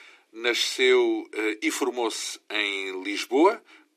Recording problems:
thin; somewhat; fading below 300 Hz

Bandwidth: 14.5 kHz